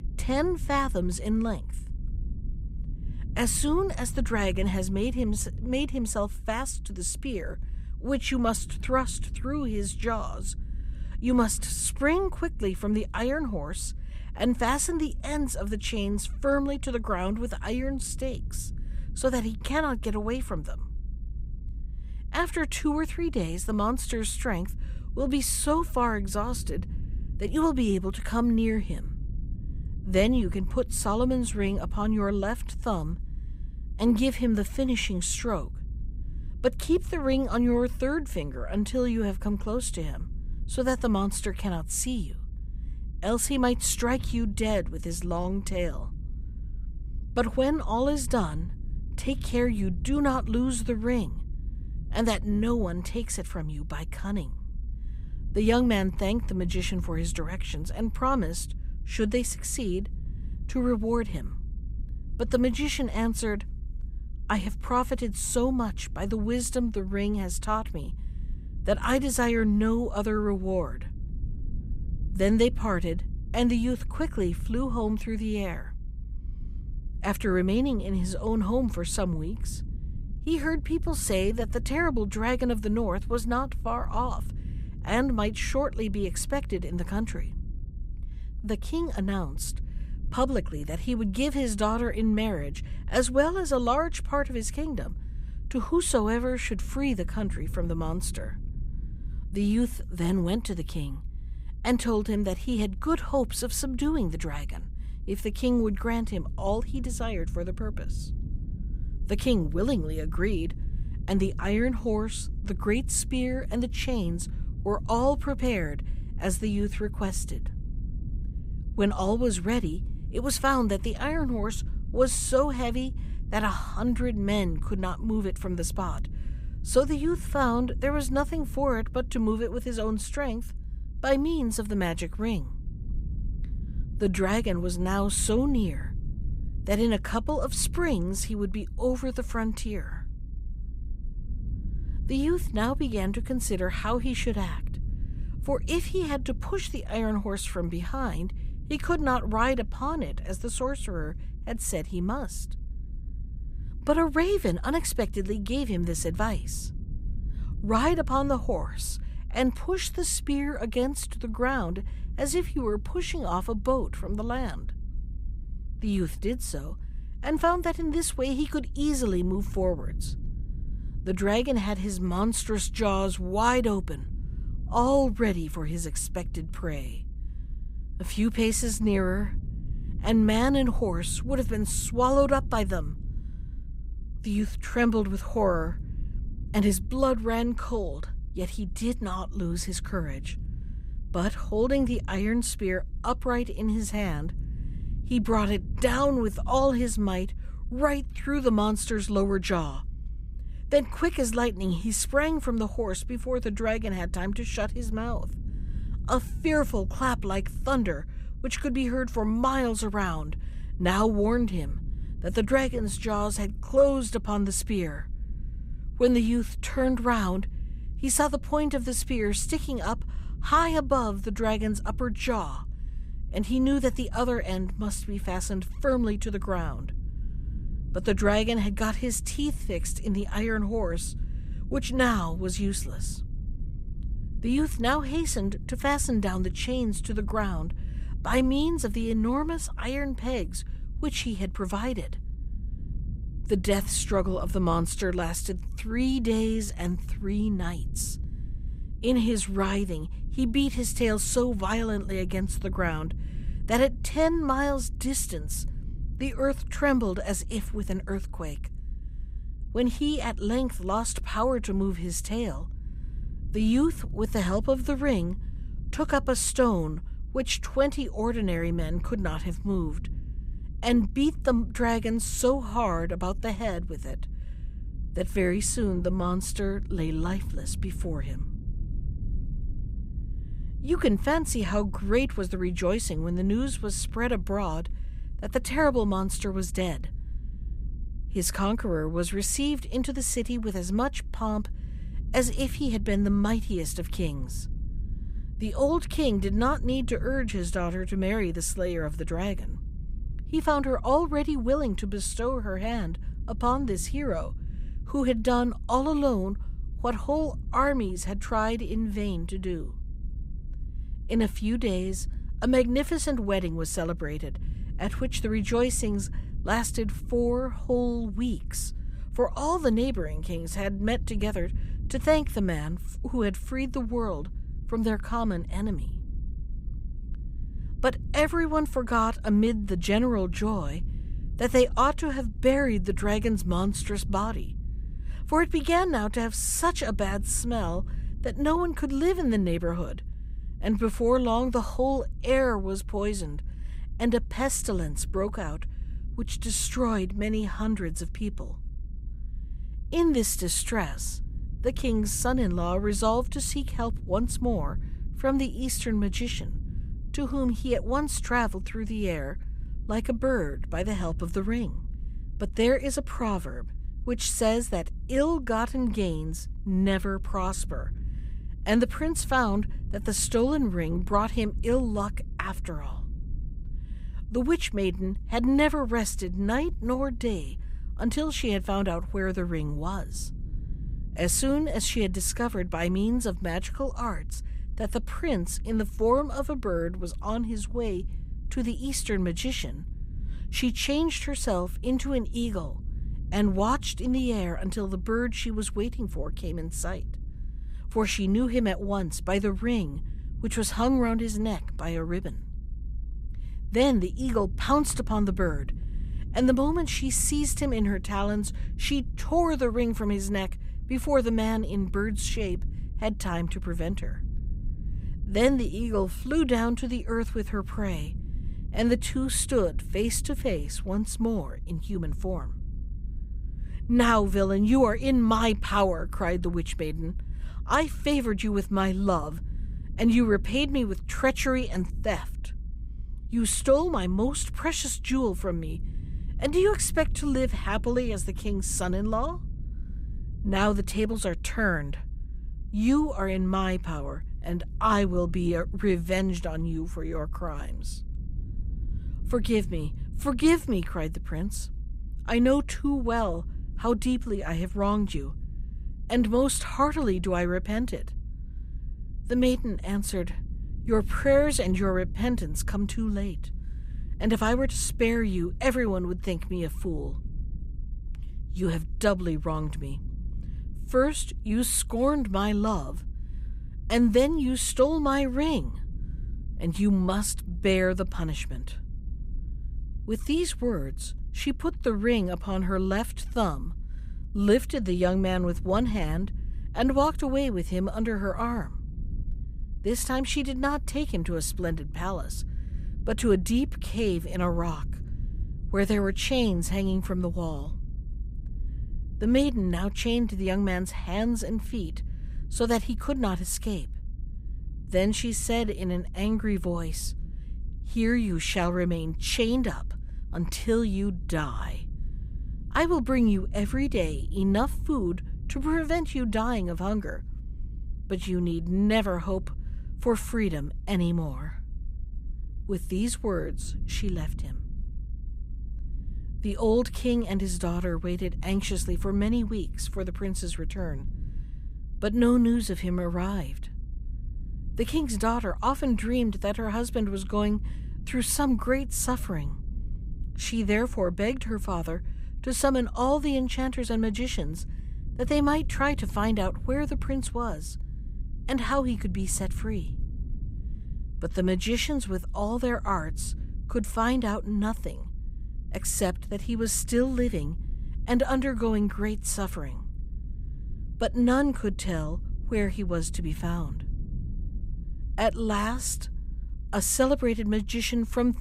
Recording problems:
low rumble; faint; throughout; 25 dB below the speech

